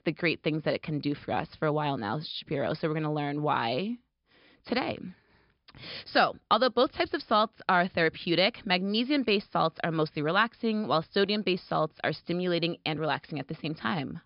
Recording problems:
high frequencies cut off; noticeable; nothing above 5.5 kHz

